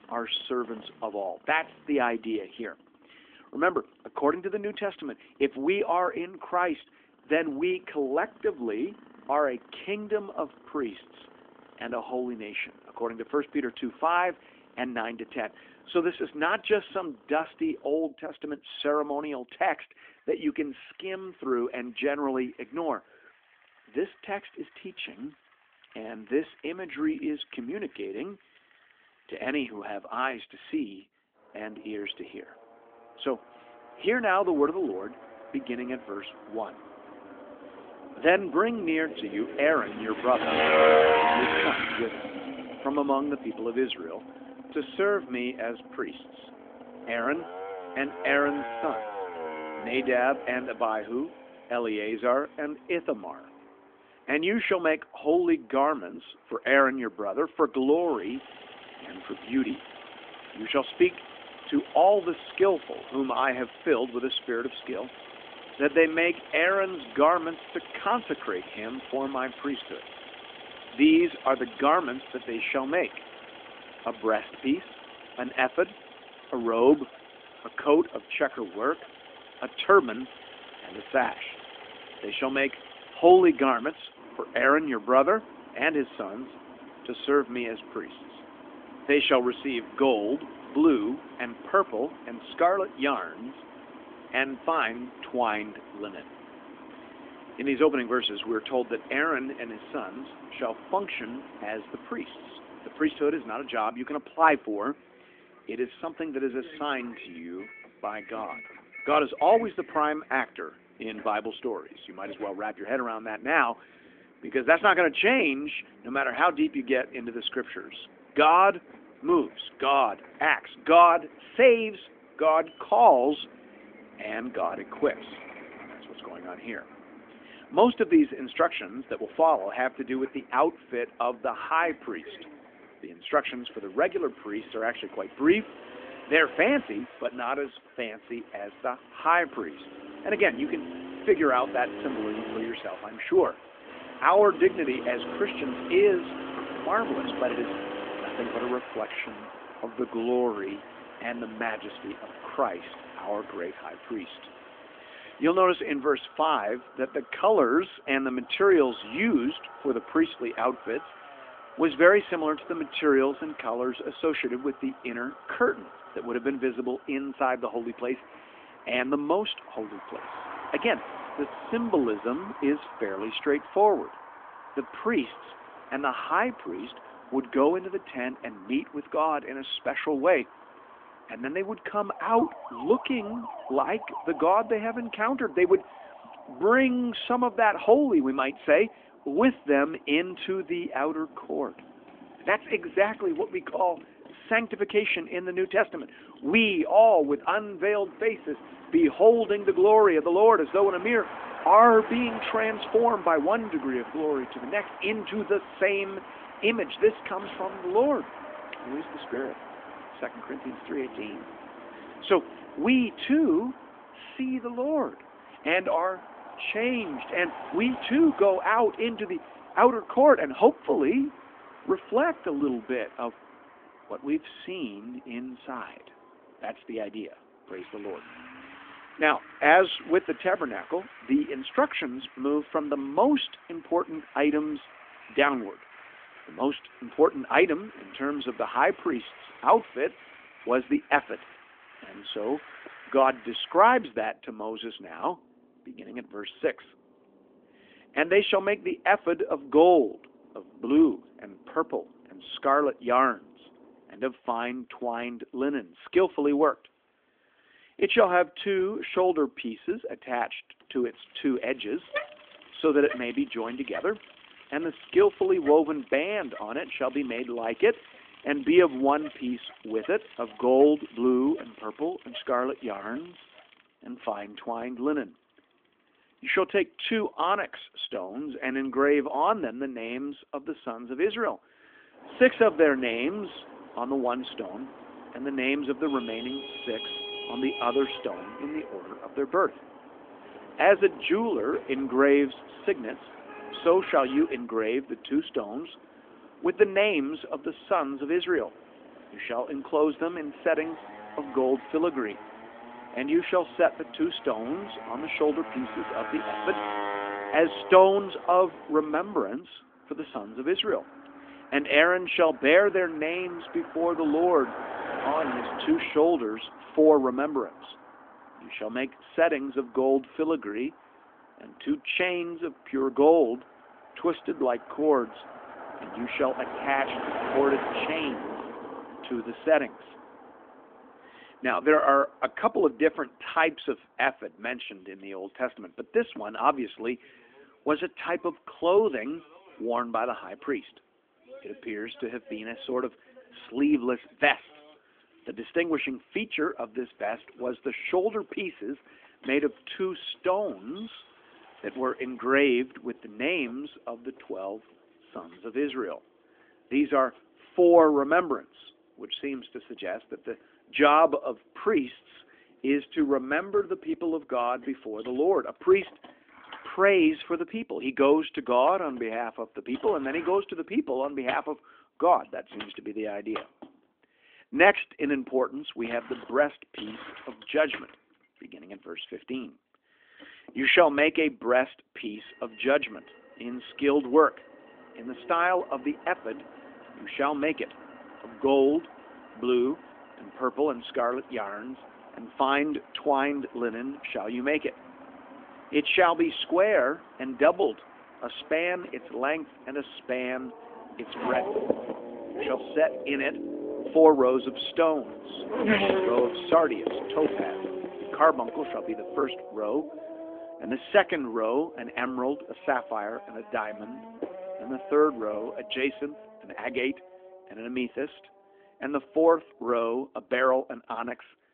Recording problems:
phone-call audio; nothing above 3.5 kHz
traffic noise; noticeable; throughout; 15 dB below the speech

